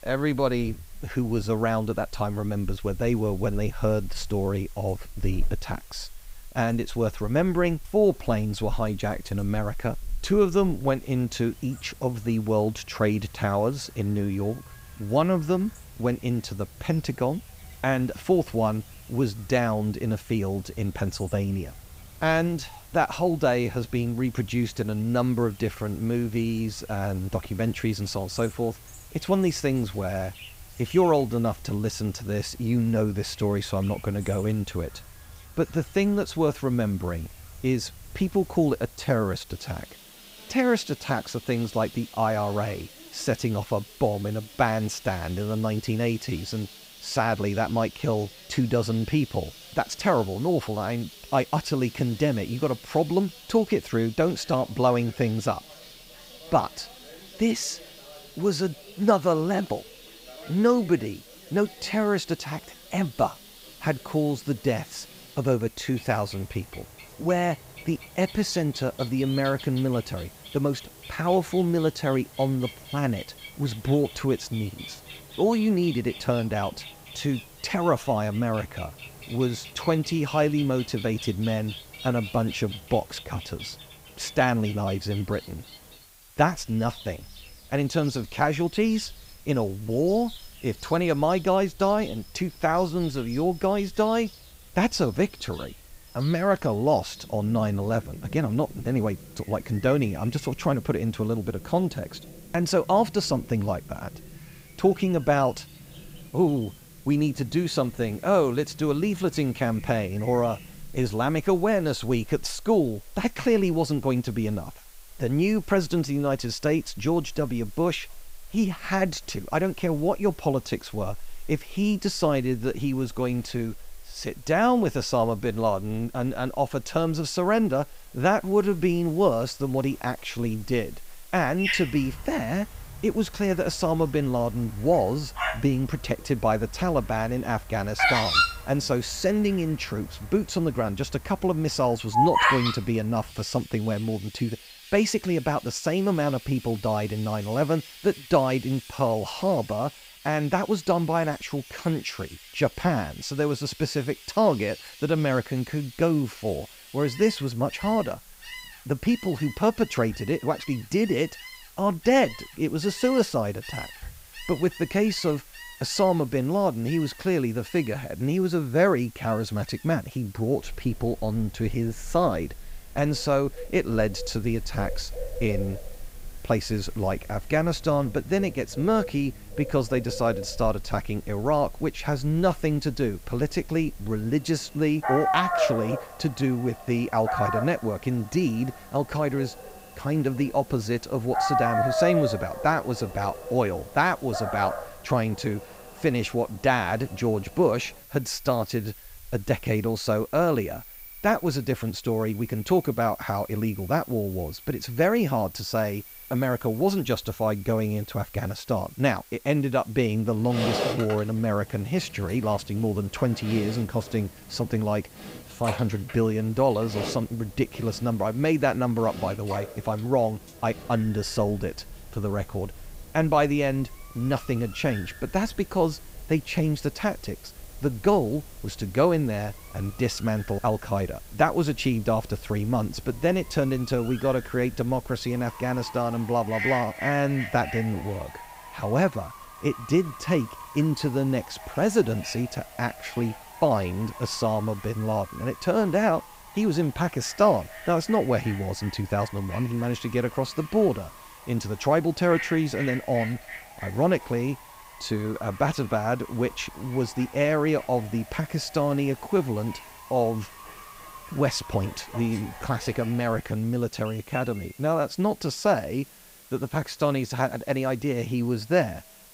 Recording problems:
animal sounds; noticeable; throughout; 10 dB below the speech
hiss; faint; throughout; 25 dB below the speech

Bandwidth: 15.5 kHz